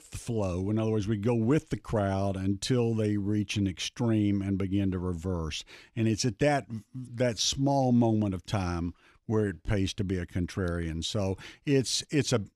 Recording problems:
uneven, jittery; slightly; from 1.5 to 9.5 s

